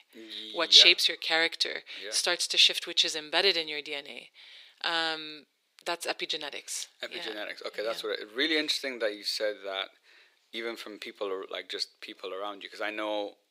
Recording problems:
thin; very; fading below 400 Hz

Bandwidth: 15.5 kHz